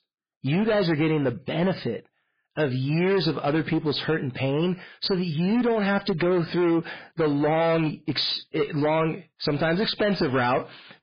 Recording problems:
garbled, watery; badly; nothing above 4.5 kHz
distortion; slight; 15% of the sound clipped

